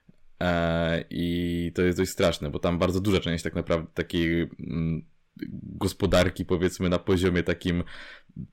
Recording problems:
distortion; slight; 10 dB below the speech

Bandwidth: 16.5 kHz